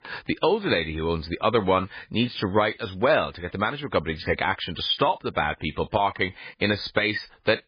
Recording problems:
garbled, watery; badly

